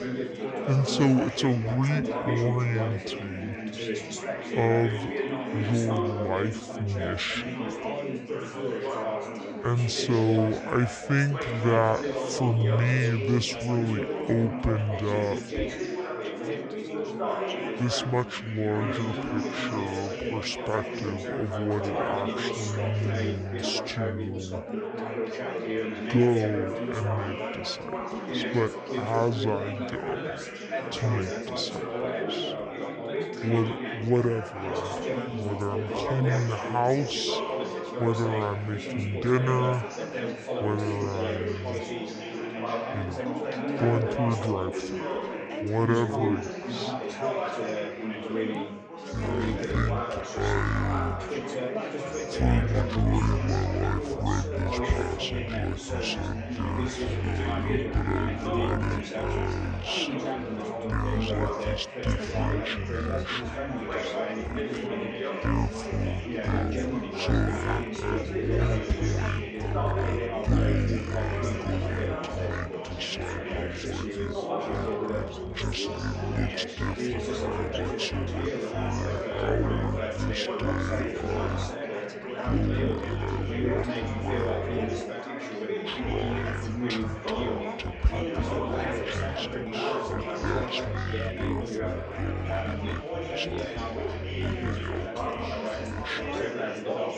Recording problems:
wrong speed and pitch; too slow and too low; 0.6 times normal speed
chatter from many people; loud; throughout; 3 dB below the speech

